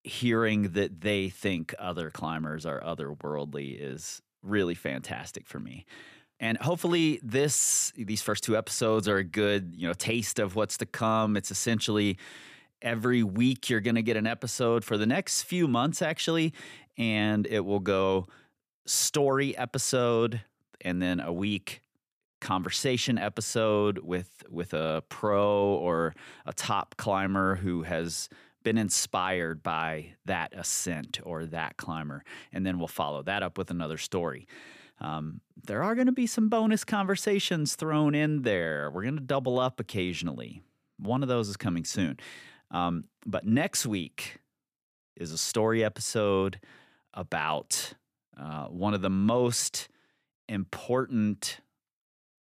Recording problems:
none

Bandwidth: 14.5 kHz